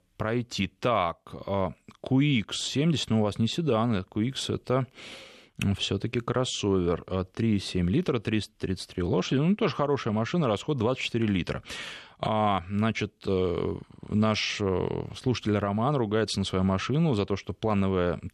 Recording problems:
none

